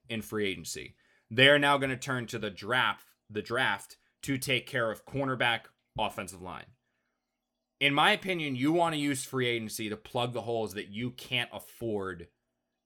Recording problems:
none

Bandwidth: 18.5 kHz